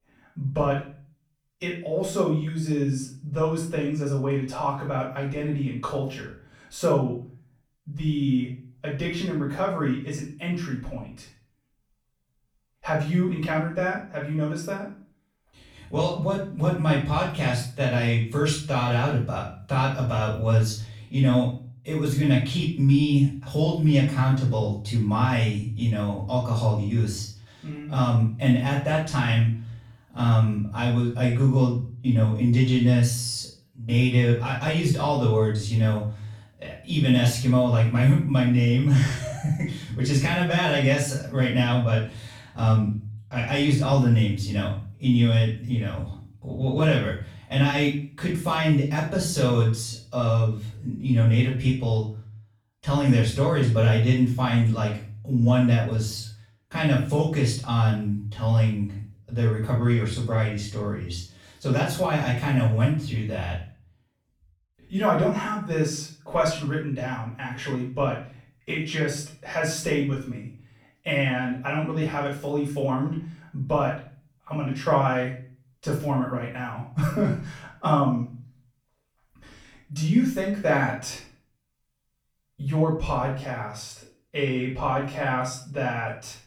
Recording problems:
off-mic speech; far
room echo; noticeable; dies away in 0.4 s

